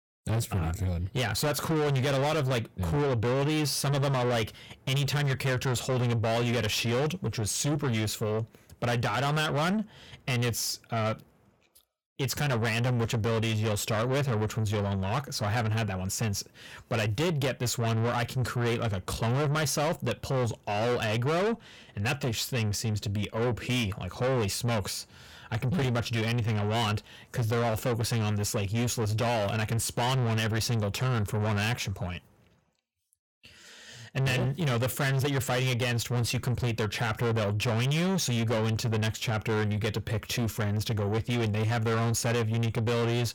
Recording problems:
distortion; heavy; 6 dB below the speech

